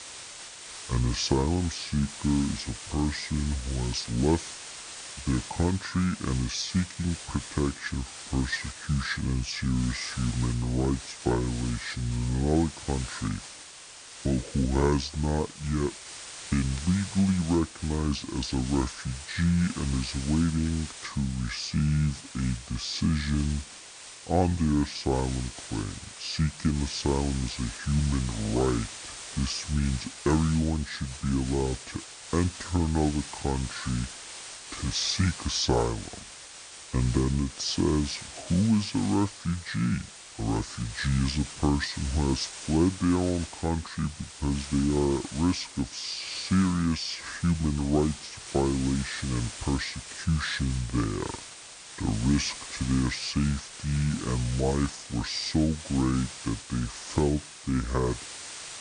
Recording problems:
wrong speed and pitch; too slow and too low; 0.6 times normal speed
hiss; noticeable; throughout; 10 dB below the speech

